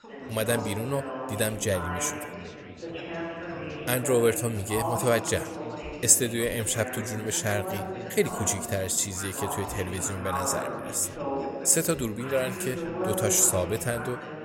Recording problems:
background chatter; loud; throughout; 4 voices, 8 dB below the speech

